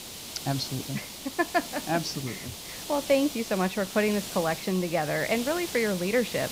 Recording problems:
hiss; loud; throughout; 8 dB below the speech

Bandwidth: 15.5 kHz